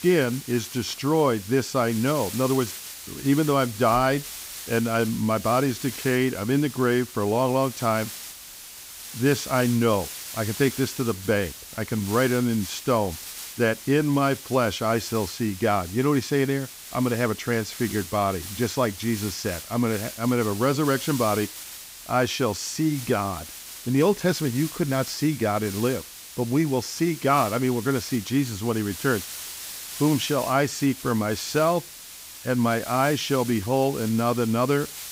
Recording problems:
hiss; noticeable; throughout; 10 dB below the speech

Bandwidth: 15.5 kHz